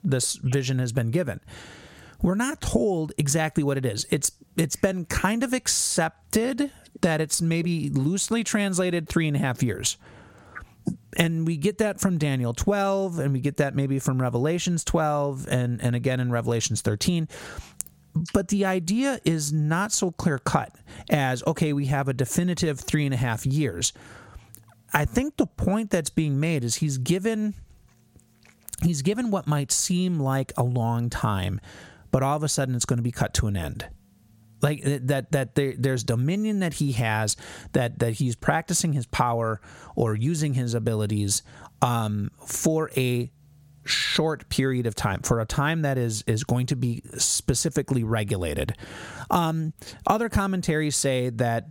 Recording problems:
squashed, flat; somewhat

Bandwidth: 16.5 kHz